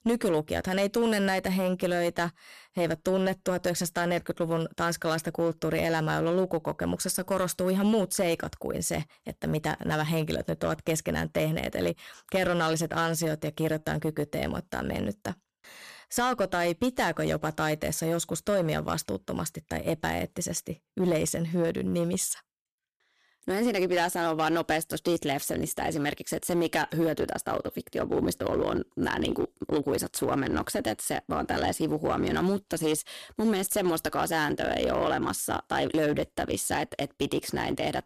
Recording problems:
distortion; slight; 6% of the sound clipped

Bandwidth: 14.5 kHz